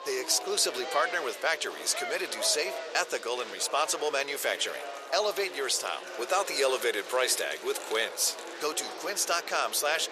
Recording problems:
thin; very; fading below 450 Hz
murmuring crowd; noticeable; throughout; 10 dB below the speech
rain or running water; faint; throughout; 20 dB below the speech

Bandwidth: 14 kHz